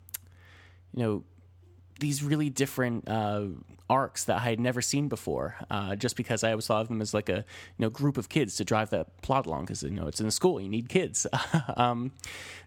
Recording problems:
none

